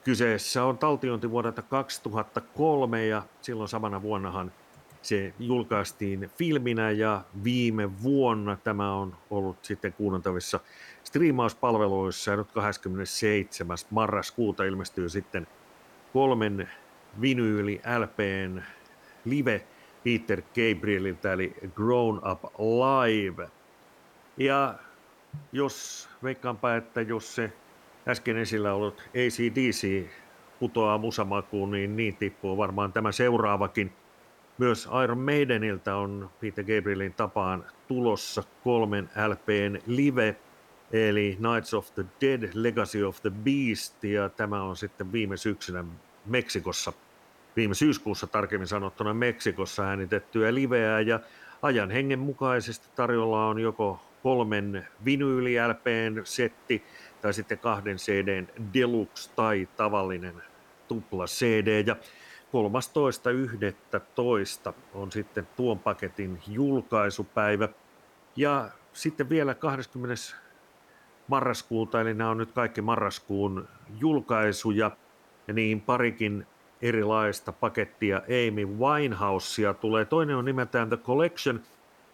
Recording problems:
hiss; faint; throughout; 30 dB below the speech

